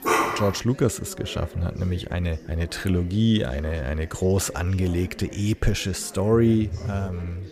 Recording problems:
background chatter; noticeable; throughout; 4 voices, 20 dB below the speech
dog barking; loud; at the start; peak 3 dB above the speech
phone ringing; noticeable; at 6.5 s; peak 8 dB below the speech

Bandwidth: 14.5 kHz